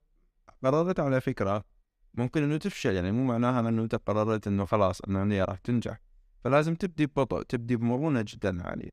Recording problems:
none

